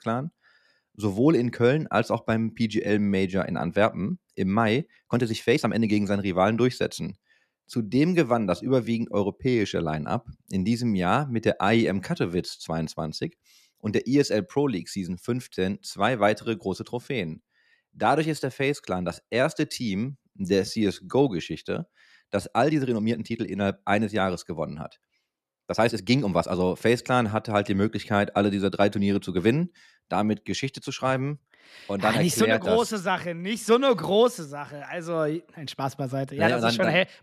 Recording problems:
uneven, jittery; strongly; from 5 to 27 s

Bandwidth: 14 kHz